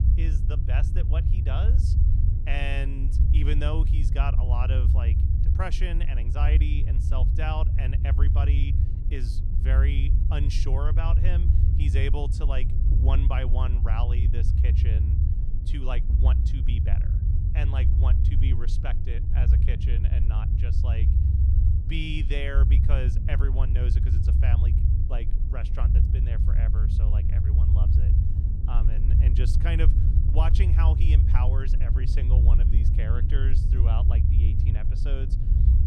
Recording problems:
low rumble; loud; throughout; 3 dB below the speech

